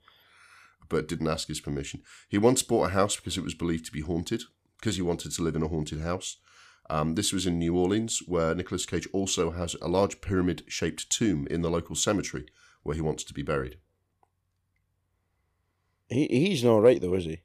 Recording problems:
none

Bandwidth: 14.5 kHz